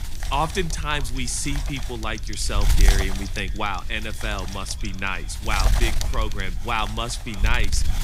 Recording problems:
echo of what is said; faint; throughout; 580 ms later, 20 dB below the speech
wind noise on the microphone; heavy; 8 dB below the speech
keyboard typing; noticeable; from 1 to 5.5 s; peak 9 dB below the speech

